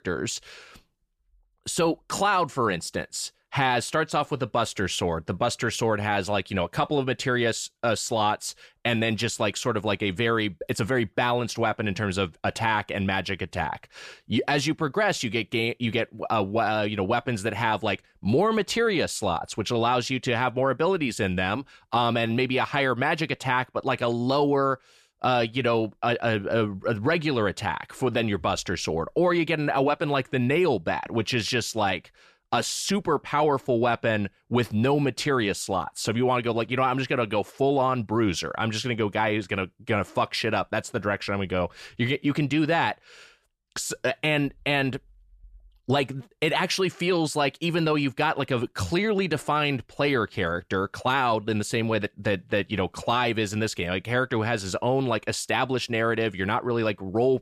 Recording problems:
none

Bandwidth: 14 kHz